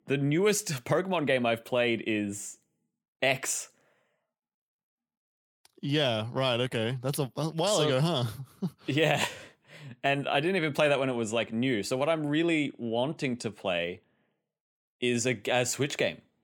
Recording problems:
none

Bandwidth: 18.5 kHz